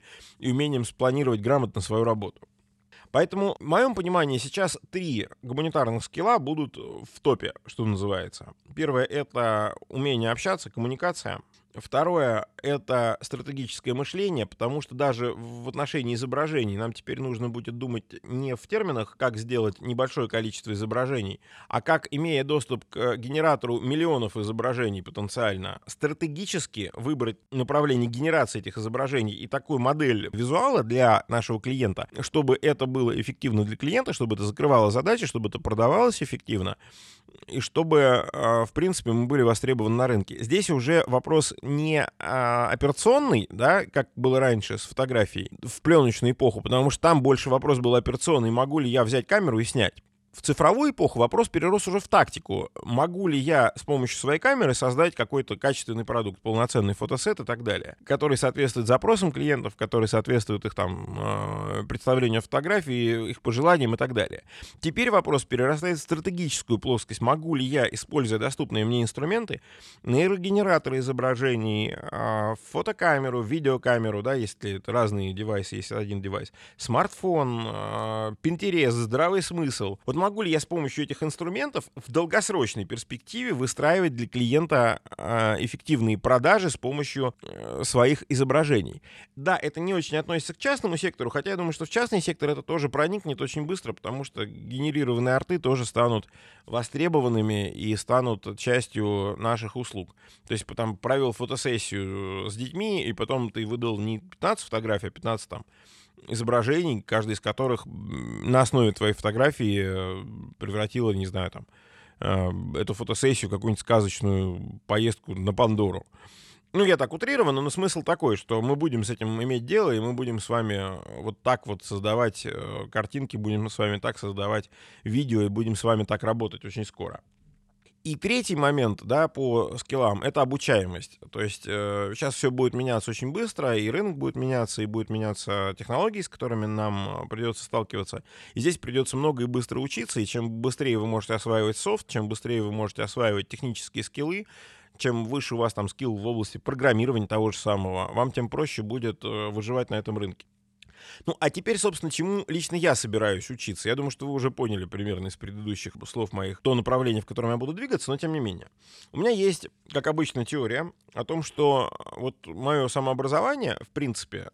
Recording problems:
none

